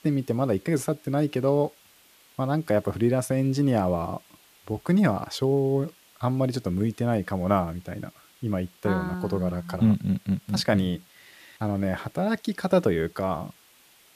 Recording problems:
hiss; faint; throughout; 30 dB below the speech

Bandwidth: 14.5 kHz